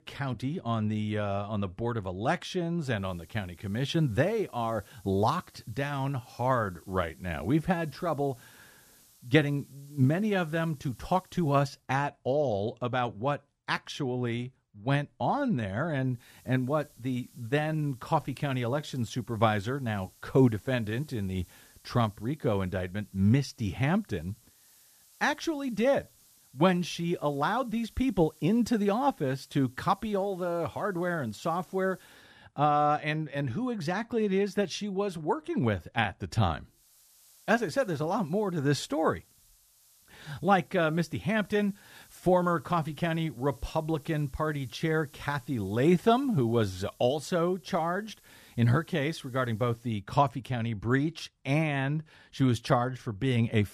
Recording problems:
hiss; faint; from 3 to 12 s, from 16 to 32 s and from 37 to 50 s; 30 dB below the speech

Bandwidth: 14.5 kHz